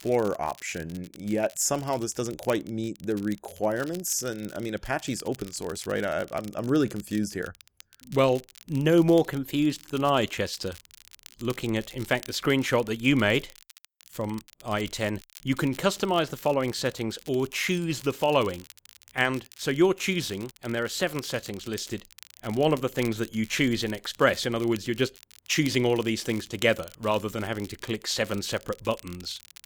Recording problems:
crackle, like an old record; faint; 20 dB below the speech

